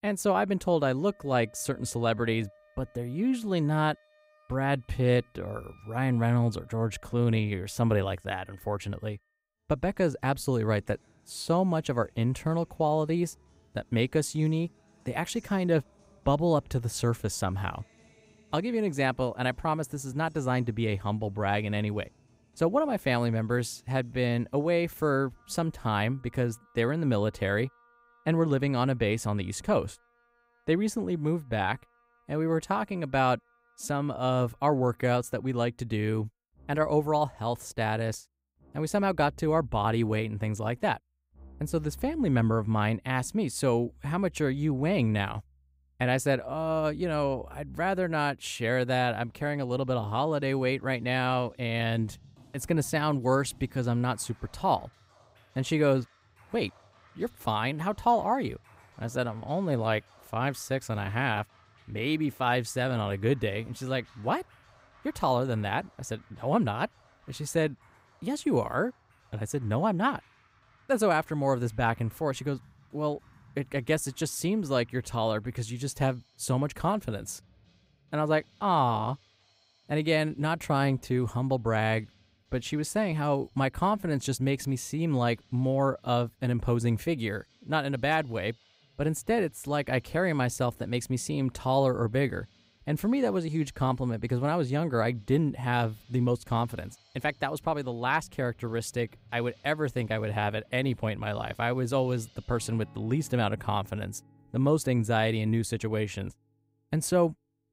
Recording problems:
background music; faint; throughout; 30 dB below the speech

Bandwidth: 15.5 kHz